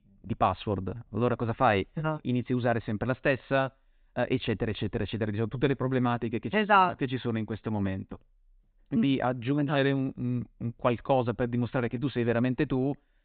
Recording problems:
high frequencies cut off; severe; nothing above 4 kHz

